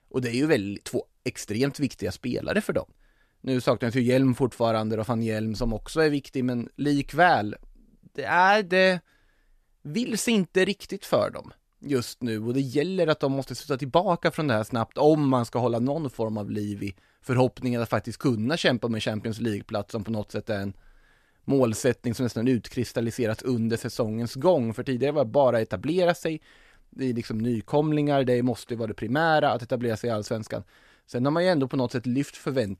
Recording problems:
none

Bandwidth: 14 kHz